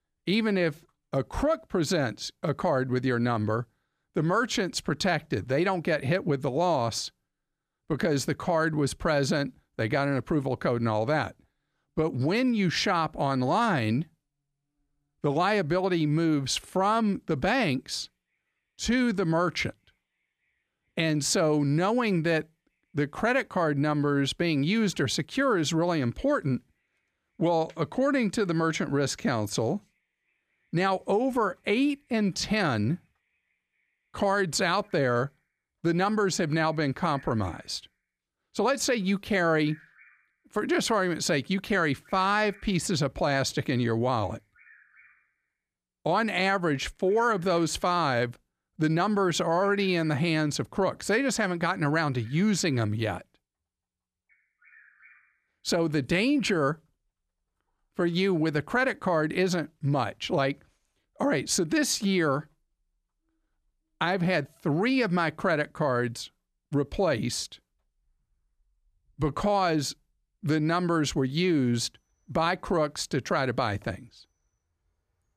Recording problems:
animal sounds; faint; throughout; 30 dB below the speech

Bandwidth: 14.5 kHz